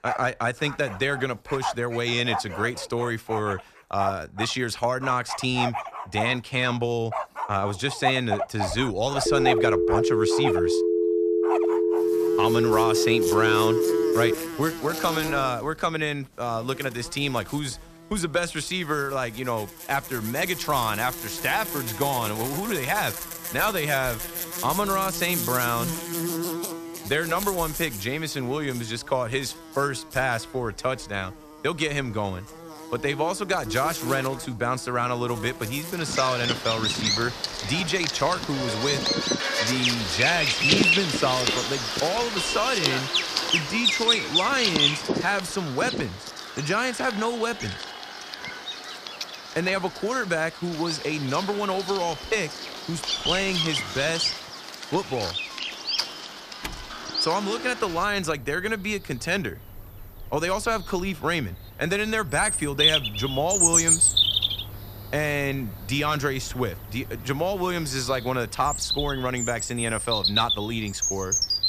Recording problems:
animal sounds; very loud; throughout; as loud as the speech
phone ringing; loud; from 9.5 to 14 s; peak 4 dB above the speech
door banging; faint; from 53 to 57 s; peak 10 dB below the speech

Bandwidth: 14.5 kHz